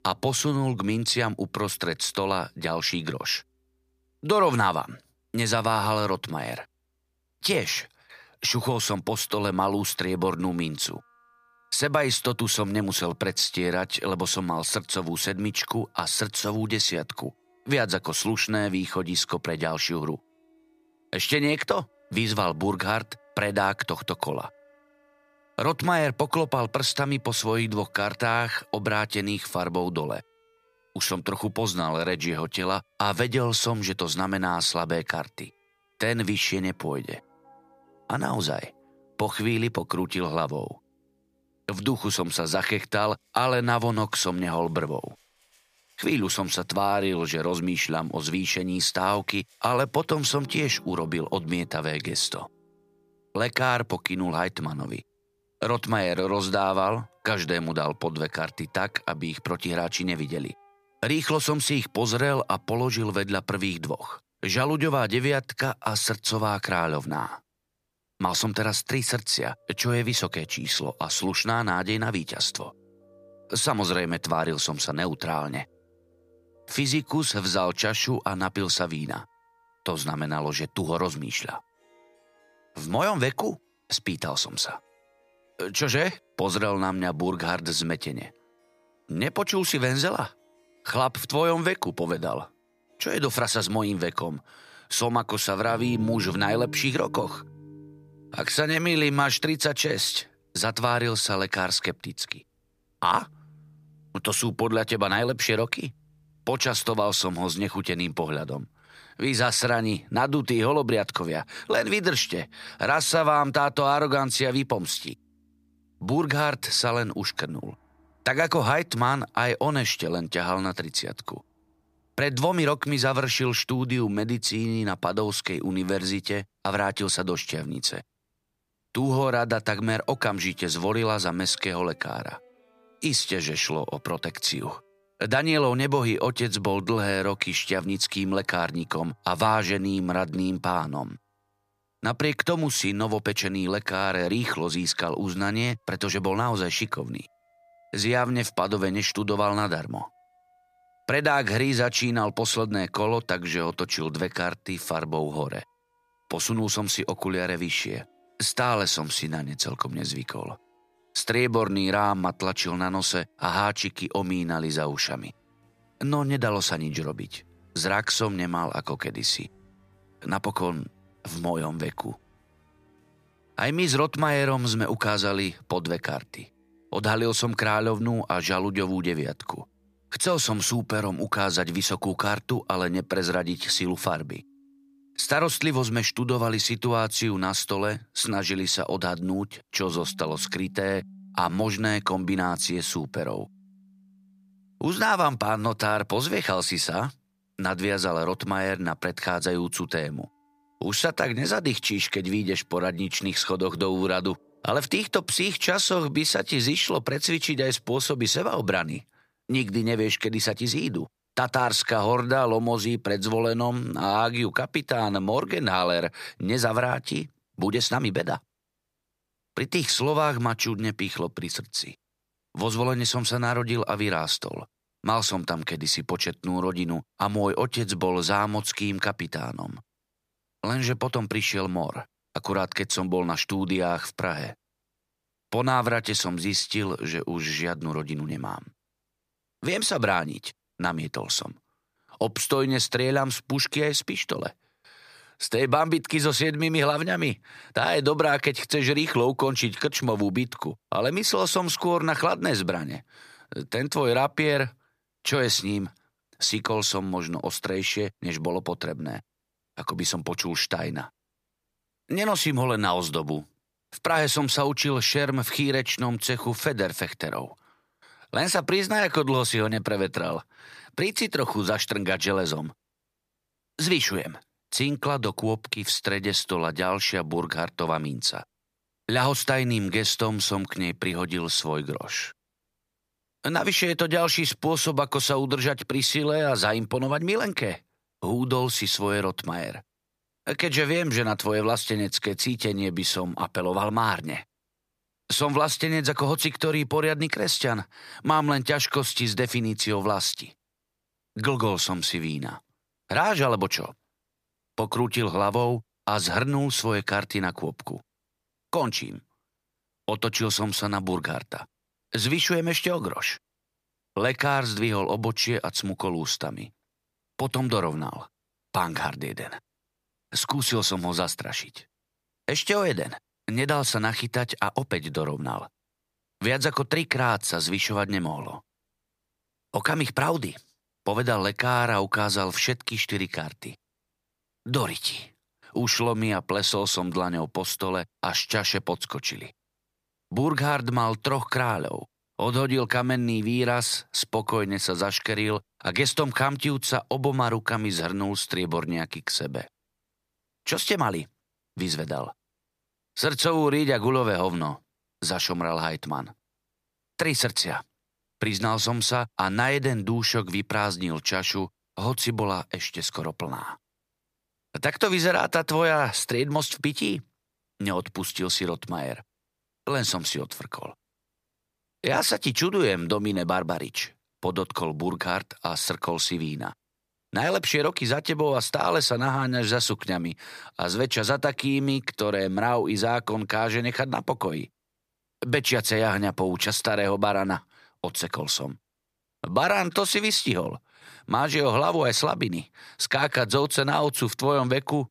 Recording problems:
background music; faint; until 3:28; 30 dB below the speech

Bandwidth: 15 kHz